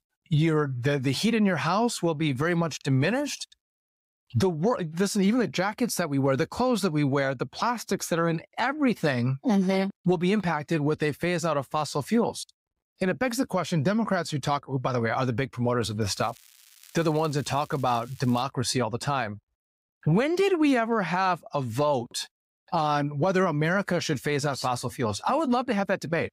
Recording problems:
crackling; faint; from 16 to 18 s; 25 dB below the speech

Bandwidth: 15.5 kHz